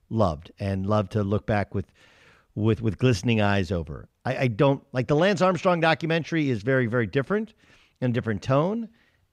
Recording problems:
none

